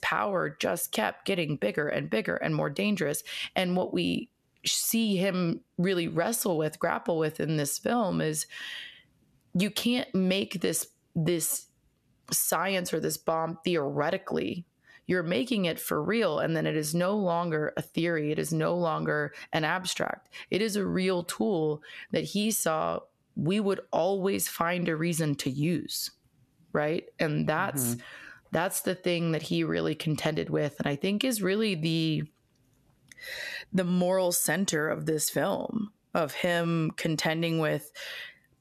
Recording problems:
squashed, flat; somewhat

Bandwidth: 13.5 kHz